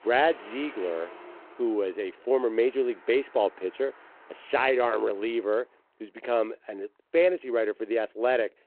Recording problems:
phone-call audio
traffic noise; faint; throughout; 20 dB below the speech

